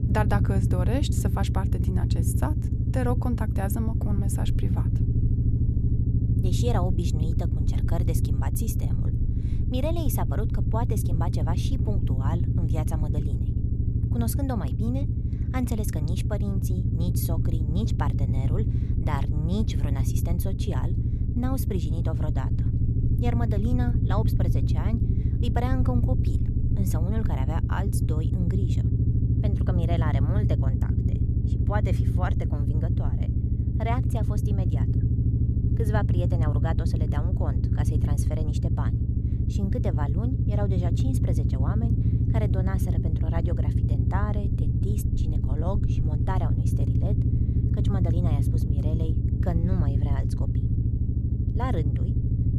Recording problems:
low rumble; loud; throughout; 2 dB below the speech

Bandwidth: 13.5 kHz